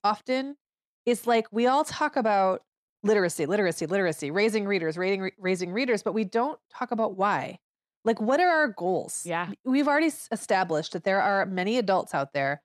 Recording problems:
none

